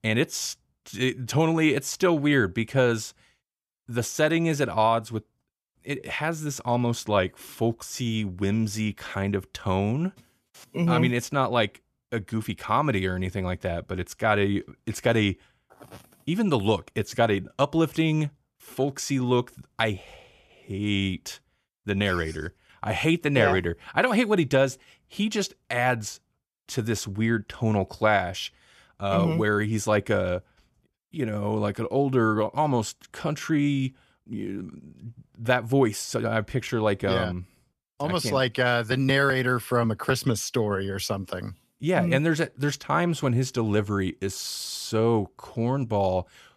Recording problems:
none

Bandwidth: 14.5 kHz